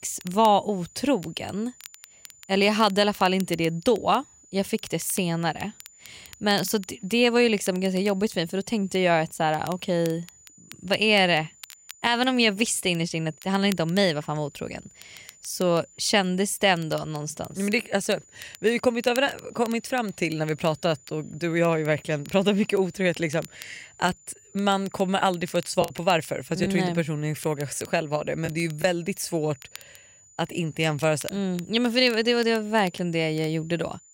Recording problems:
high-pitched whine; faint; throughout; 7 kHz, 25 dB below the speech
crackle, like an old record; faint; 20 dB below the speech
choppy; occasionally; from 26 to 29 s; 3% of the speech affected

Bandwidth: 16 kHz